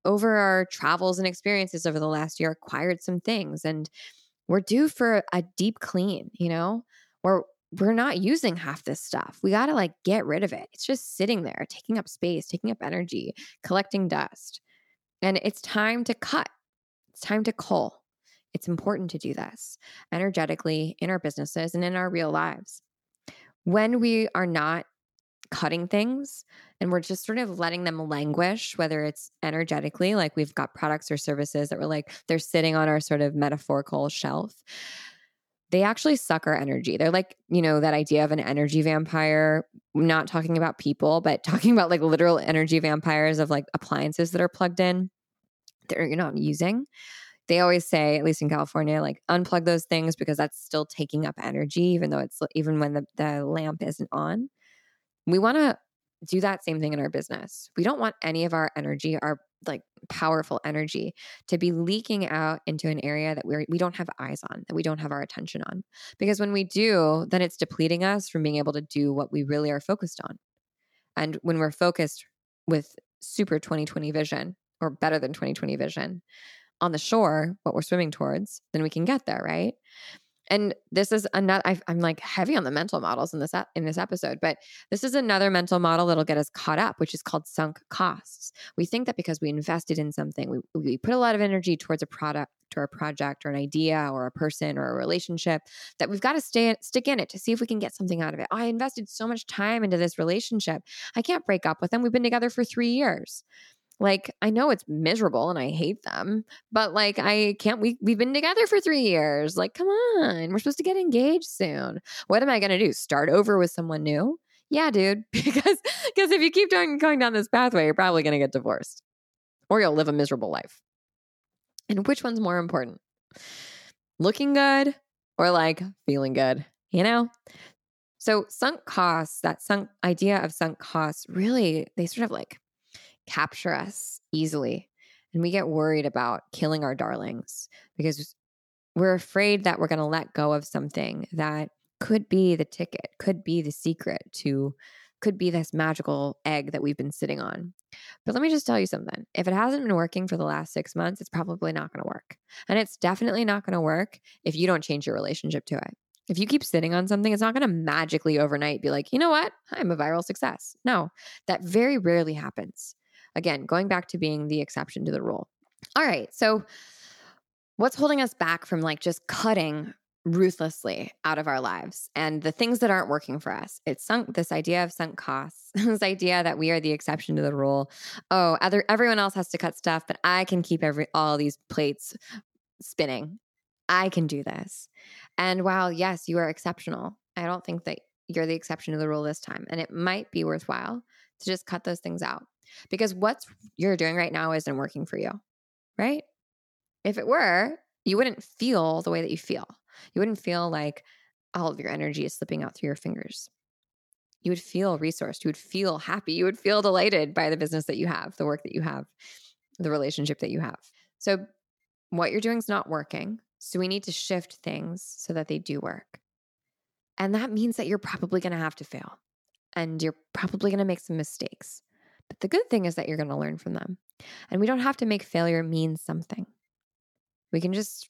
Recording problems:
none

